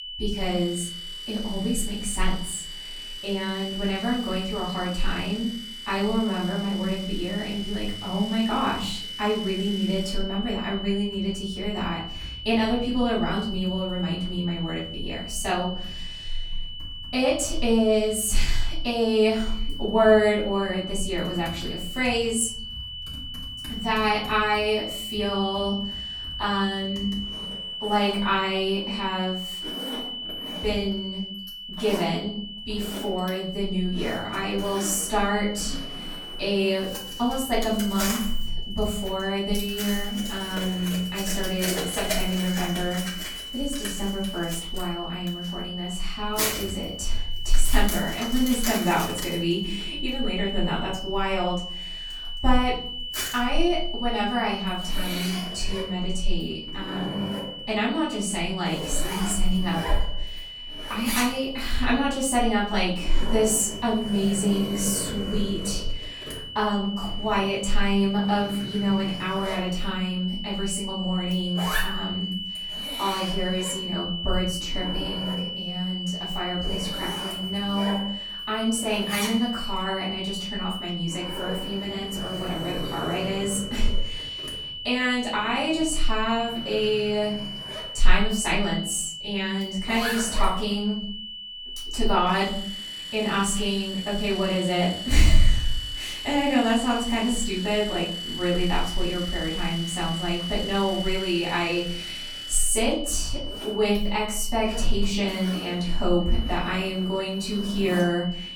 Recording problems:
off-mic speech; far
room echo; noticeable; dies away in 0.6 s
high-pitched whine; loud; throughout; 3 kHz, 7 dB below the speech
household noises; noticeable; throughout; 10 dB below the speech

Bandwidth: 17.5 kHz